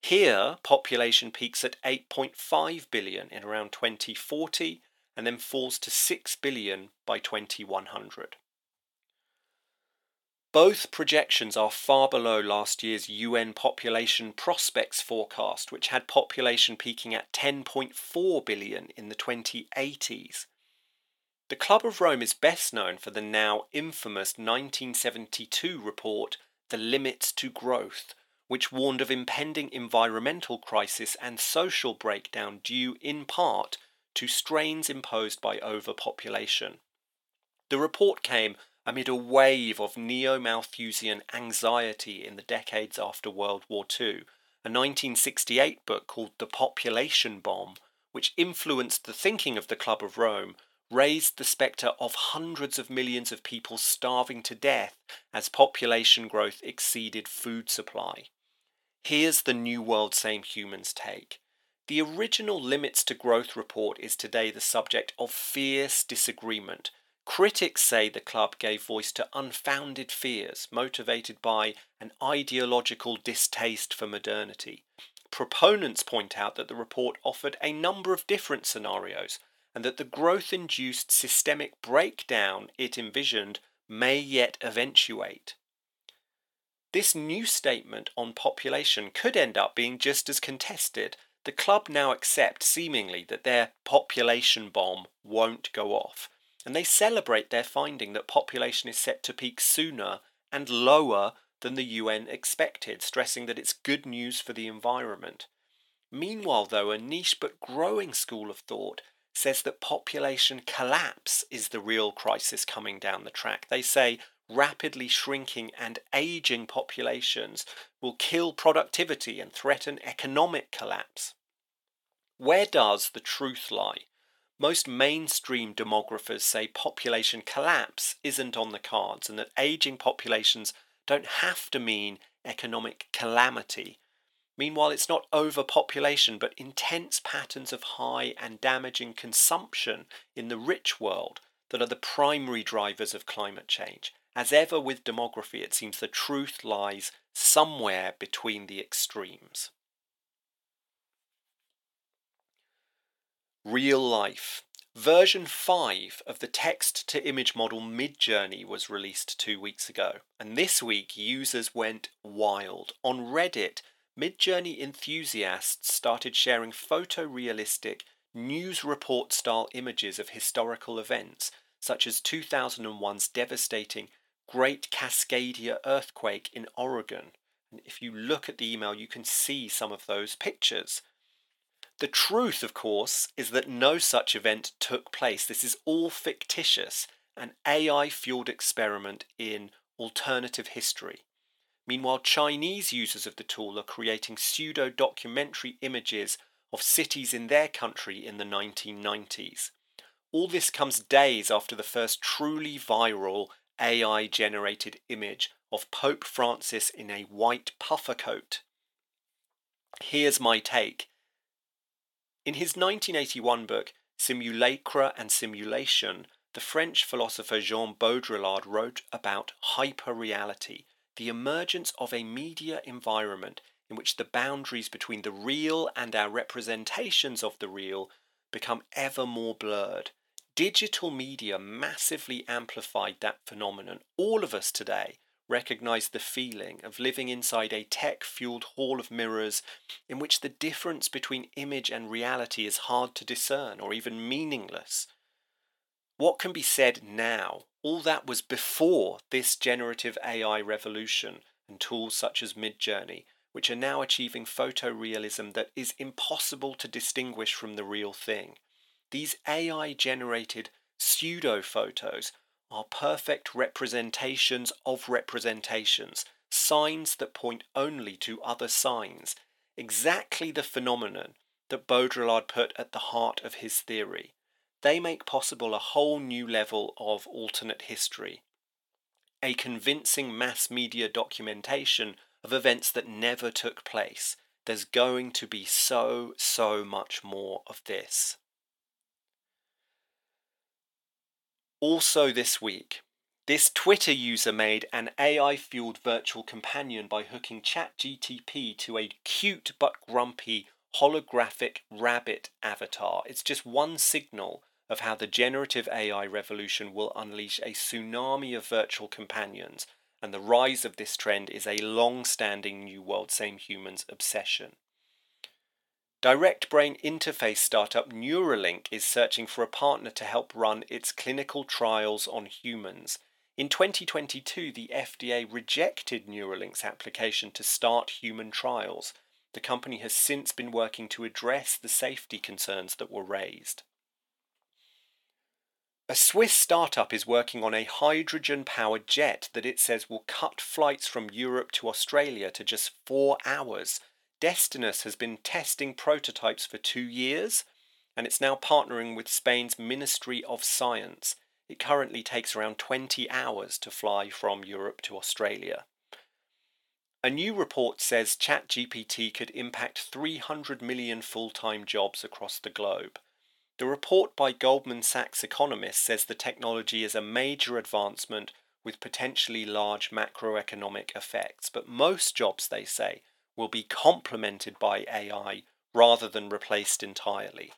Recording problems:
thin; very; fading below 600 Hz

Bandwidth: 17 kHz